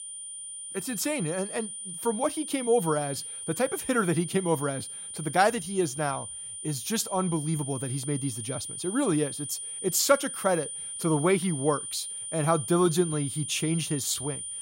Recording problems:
high-pitched whine; loud; throughout; 9.5 kHz, 7 dB below the speech

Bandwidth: 16 kHz